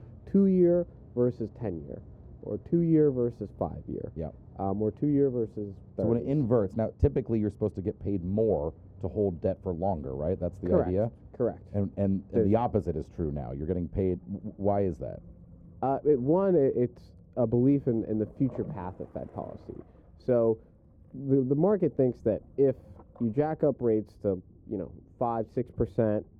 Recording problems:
muffled; very; fading above 1.5 kHz
rain or running water; faint; throughout; 25 dB below the speech

